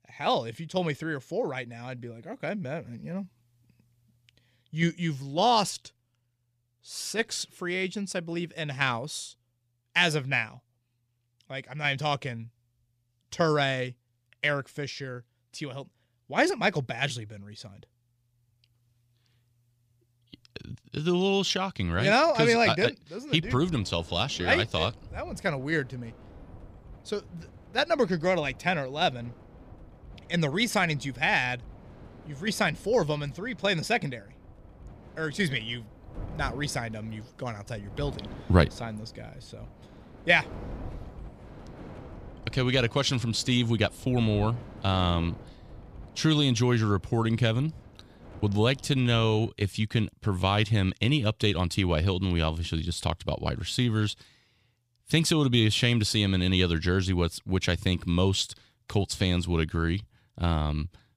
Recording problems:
wind noise on the microphone; occasional gusts; from 23 to 49 s; 25 dB below the speech

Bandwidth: 15 kHz